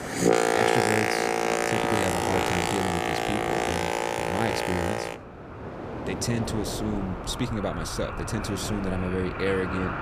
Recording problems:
train or aircraft noise; very loud; throughout; 4 dB above the speech

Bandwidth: 15 kHz